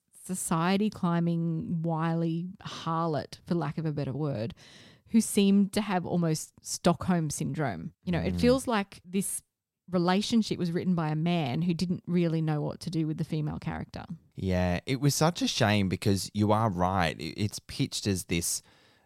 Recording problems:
none

